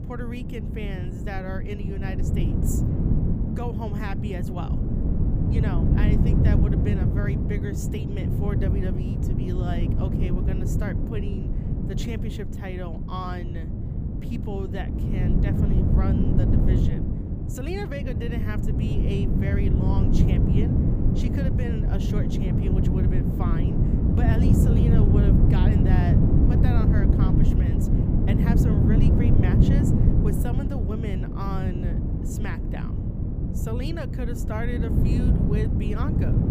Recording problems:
wind noise on the microphone; heavy; 3 dB above the speech

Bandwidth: 15 kHz